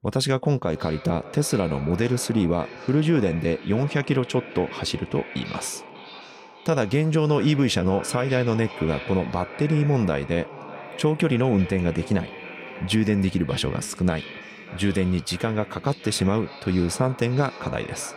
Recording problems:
echo of what is said; noticeable; throughout; 590 ms later, 15 dB below the speech

